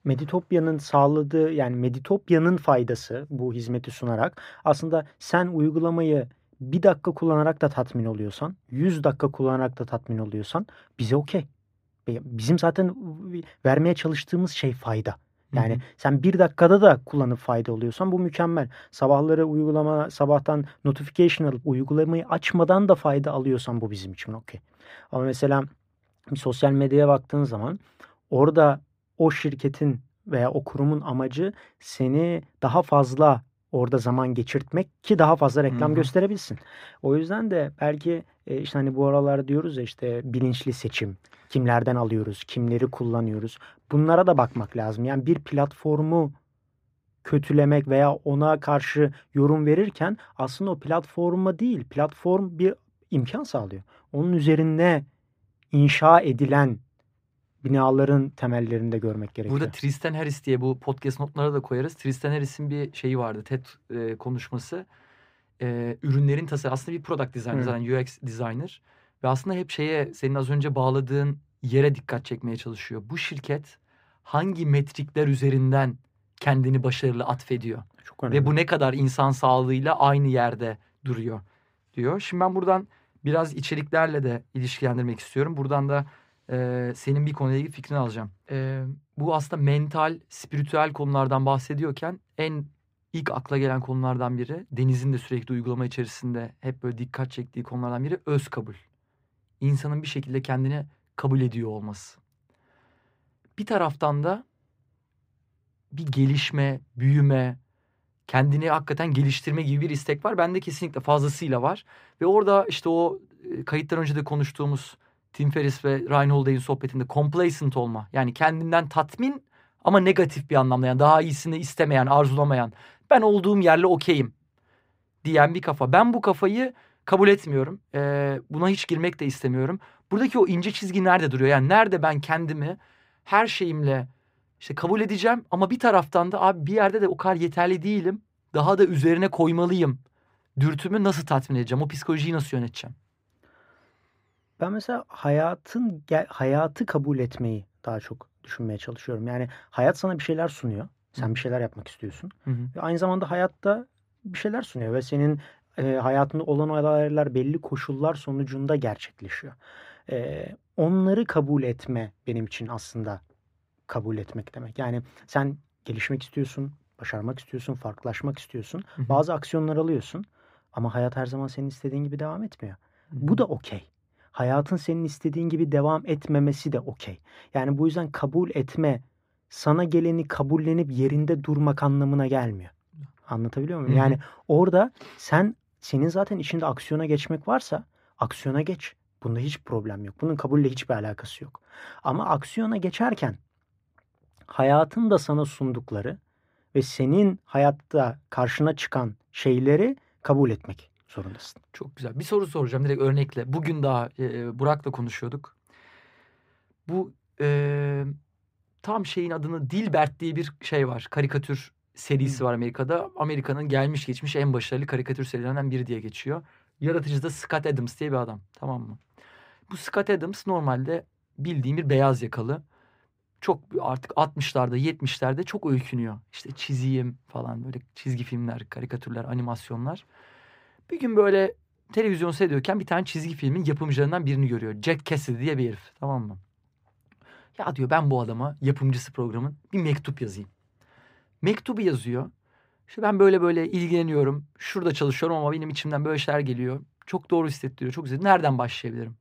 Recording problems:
muffled; slightly; fading above 3 kHz

